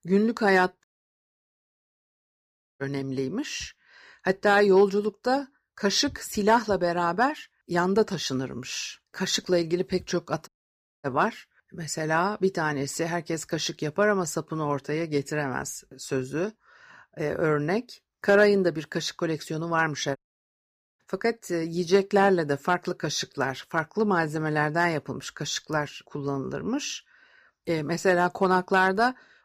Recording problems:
audio cutting out; at 1 s for 2 s, at 10 s for 0.5 s and at 20 s for 1 s

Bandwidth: 15 kHz